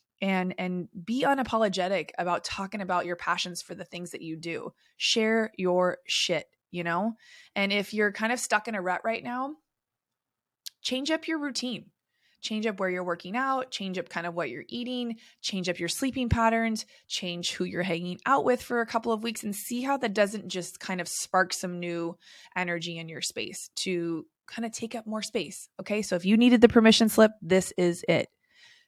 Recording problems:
none

